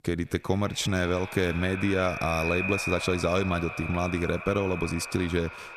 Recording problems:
echo of what is said; strong; throughout; 170 ms later, 6 dB below the speech

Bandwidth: 14.5 kHz